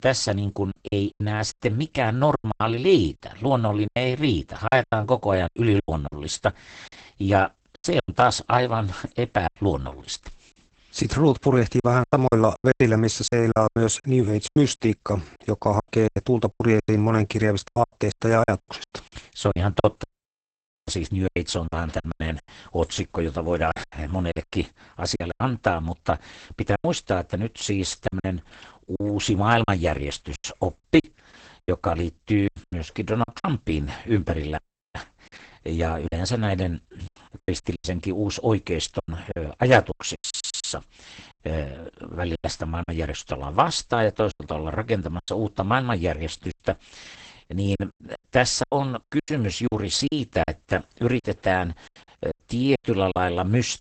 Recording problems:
garbled, watery; badly; nothing above 8 kHz
choppy; very; 12% of the speech affected
audio cutting out; at 20 s for 1 s and at 35 s
audio stuttering; at 40 s

